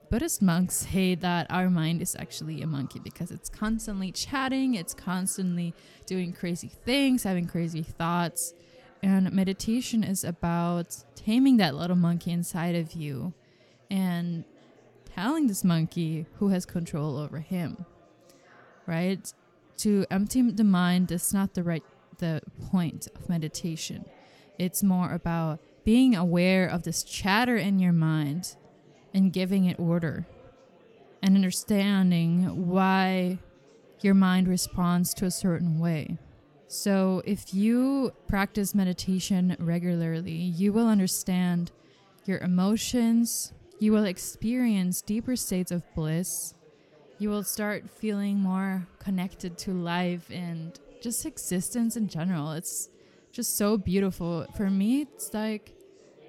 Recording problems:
chatter from many people; faint; throughout; 30 dB below the speech

